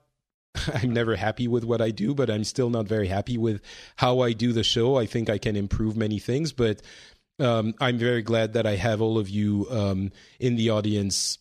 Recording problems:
none

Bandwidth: 14 kHz